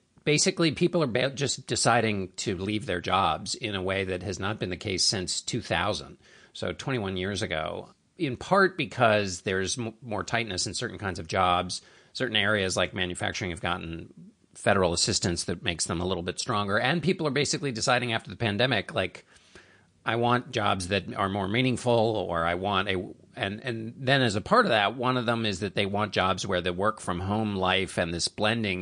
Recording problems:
garbled, watery; slightly; nothing above 9 kHz
abrupt cut into speech; at the end

